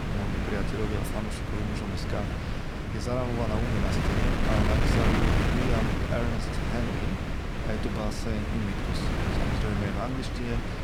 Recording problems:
wind noise on the microphone; heavy; 3 dB above the speech

